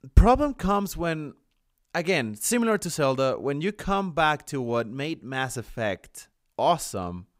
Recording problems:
none

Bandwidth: 15.5 kHz